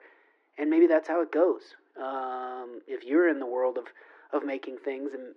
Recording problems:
muffled; very; fading above 1.5 kHz
thin; somewhat; fading below 300 Hz

